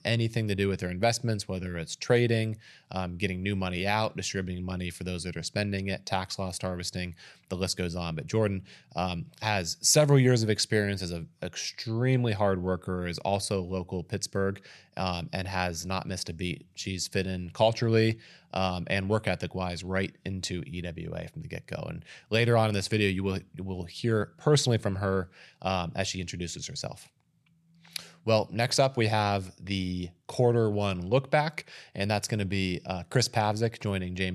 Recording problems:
abrupt cut into speech; at the end

